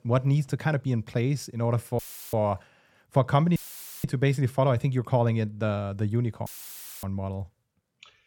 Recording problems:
audio cutting out; filled with static; at 2 s, at 3.5 s and at 6.5 s for 0.5 s

